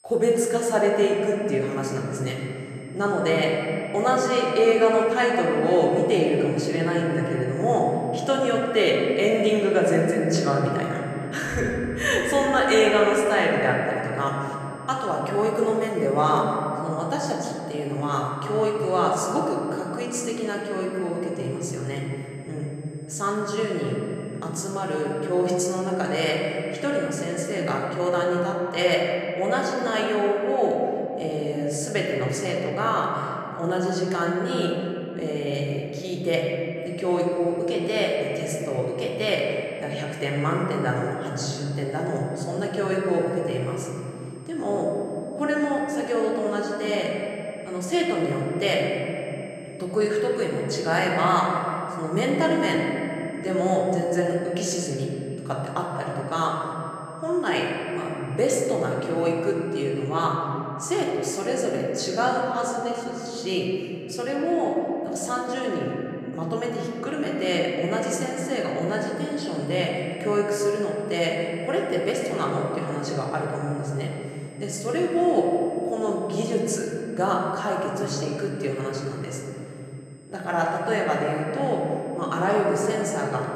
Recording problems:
room echo; noticeable; dies away in 3 s
off-mic speech; somewhat distant
high-pitched whine; faint; until 28 s, from 37 s to 1:00 and from 1:09 on; 8 kHz, 30 dB below the speech

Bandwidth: 14.5 kHz